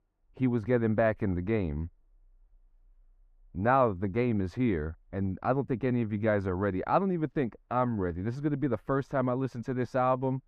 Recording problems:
muffled; very; fading above 2.5 kHz

